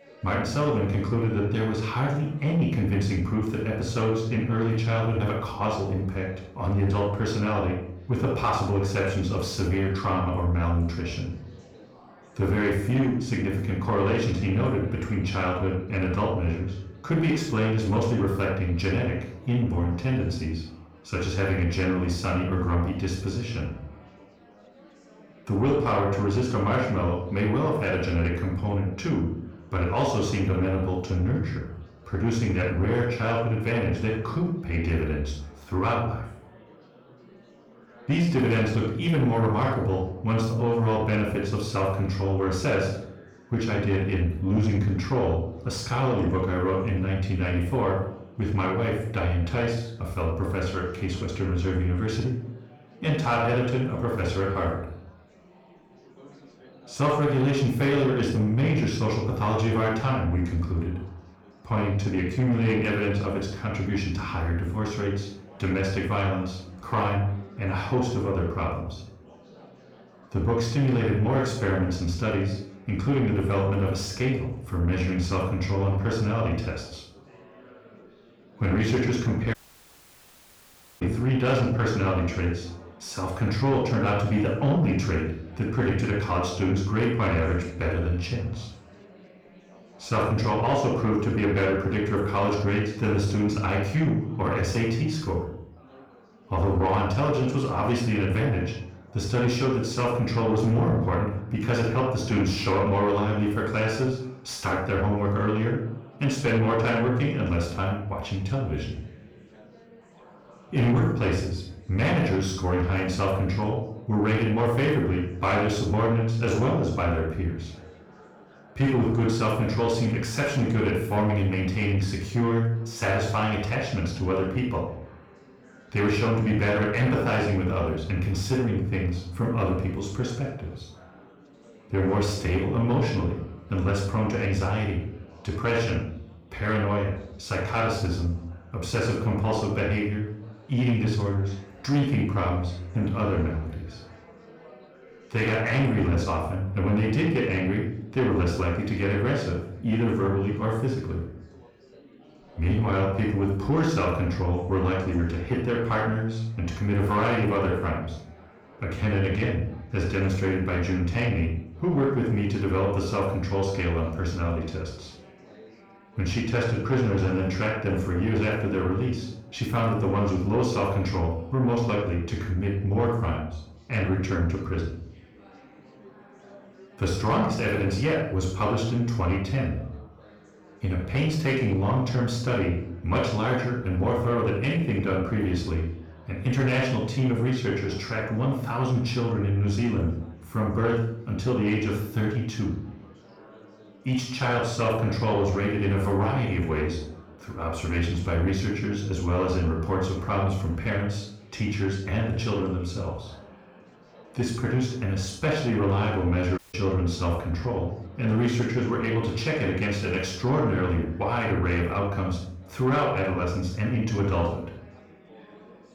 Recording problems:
off-mic speech; far
room echo; noticeable; dies away in 0.5 s
distortion; slight; 10 dB below the speech
chatter from many people; faint; throughout; 25 dB below the speech
audio cutting out; at 1:20 for 1.5 s and at 3:27

